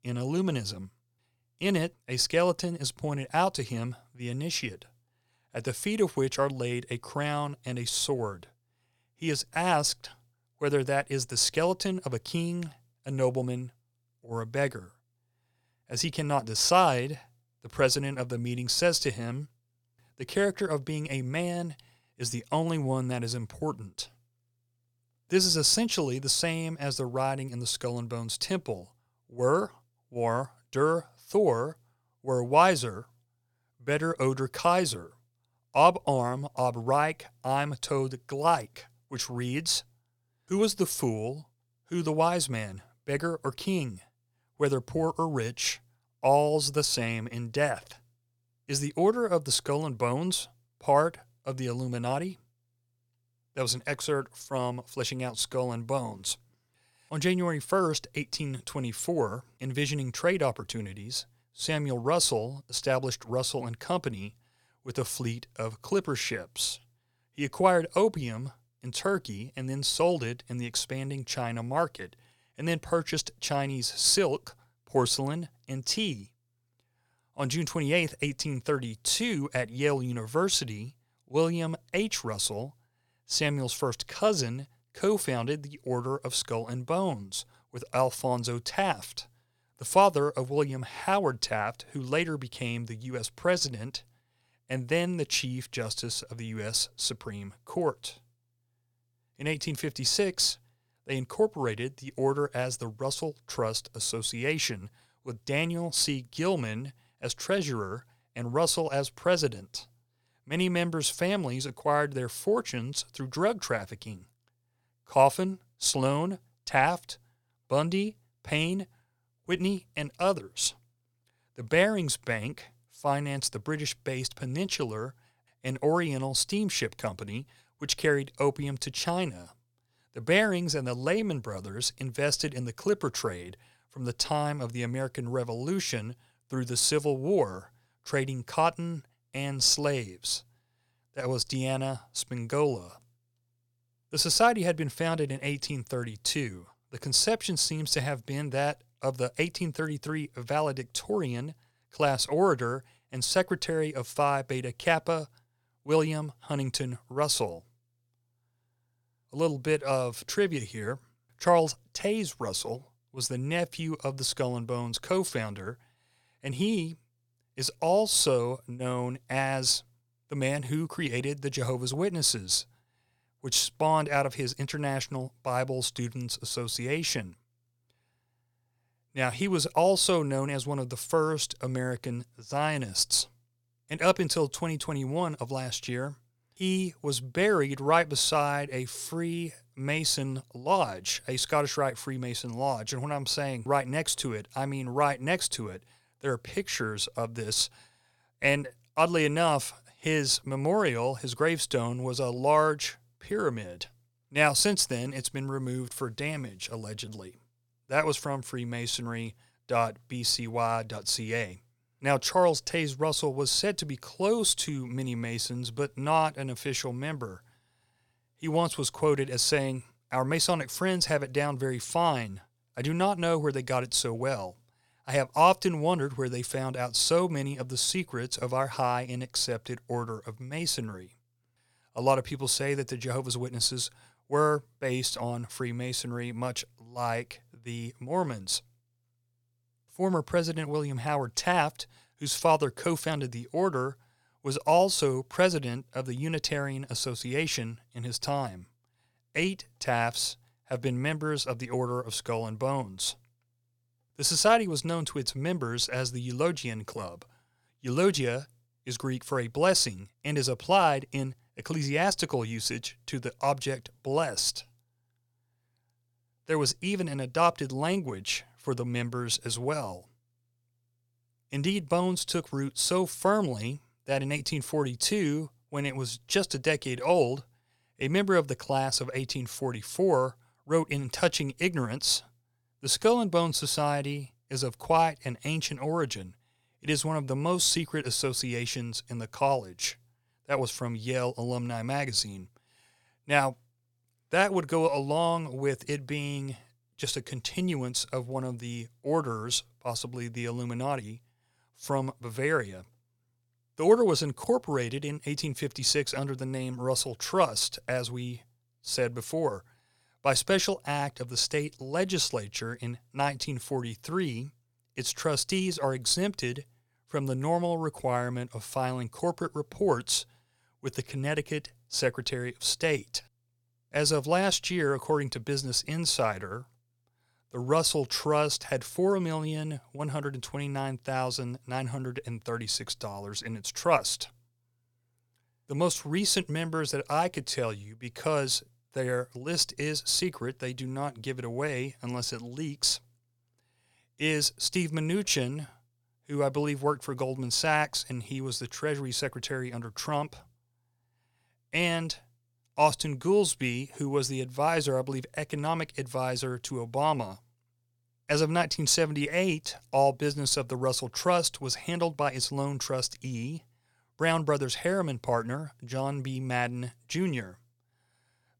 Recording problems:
none

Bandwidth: 18.5 kHz